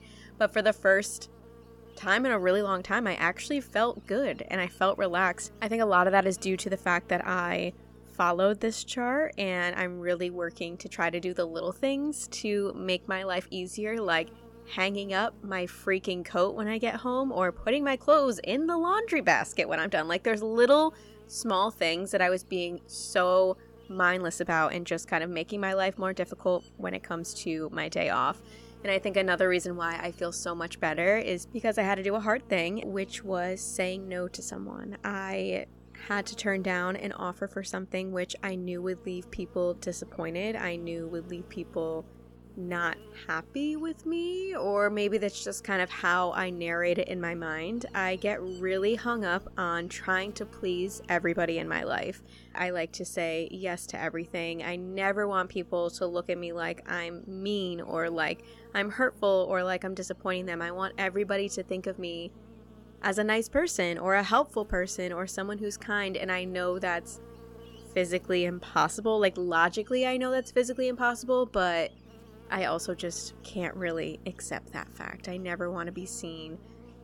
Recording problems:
electrical hum; faint; throughout; 60 Hz, 25 dB below the speech

